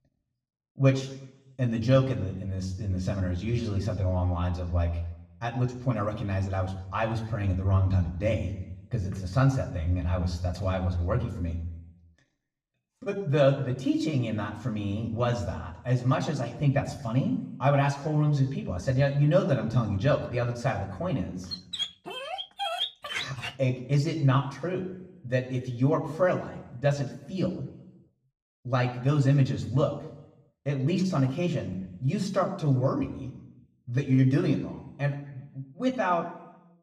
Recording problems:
room echo; slight; dies away in 0.7 s
off-mic speech; somewhat distant
dog barking; noticeable; from 22 to 24 s; peak 2 dB below the speech

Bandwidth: 15 kHz